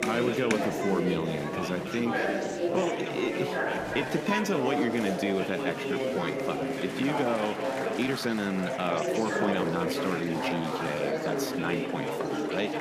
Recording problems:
chatter from many people; very loud; throughout; 1 dB above the speech
uneven, jittery; strongly; from 2.5 to 12 s

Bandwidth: 14.5 kHz